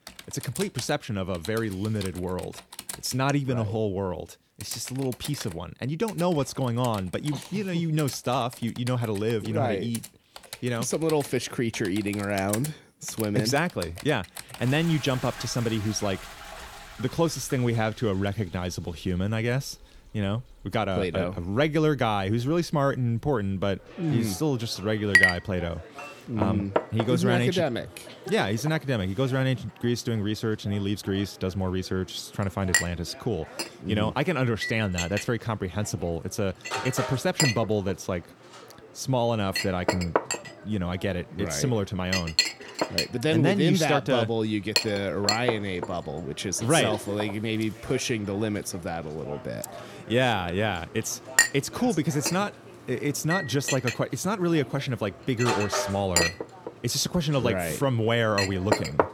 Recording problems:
household noises; loud; throughout; 3 dB below the speech

